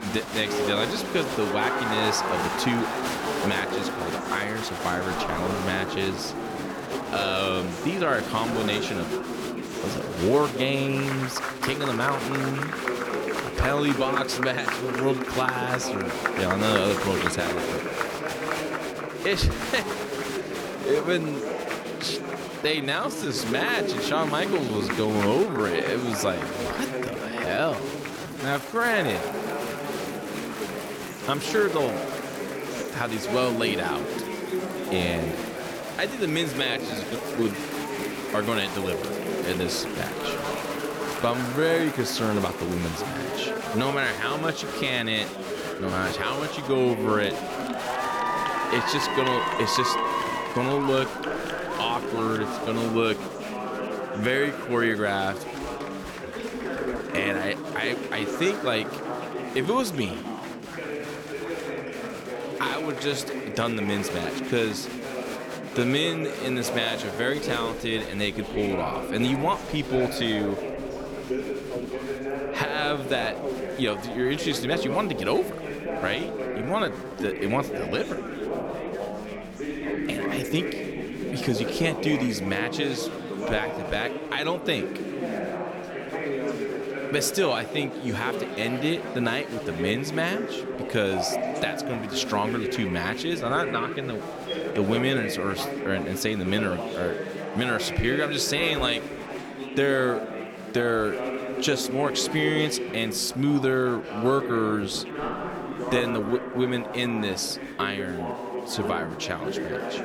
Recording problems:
chatter from many people; loud; throughout; 3 dB below the speech
uneven, jittery; strongly; from 7 s to 1:46

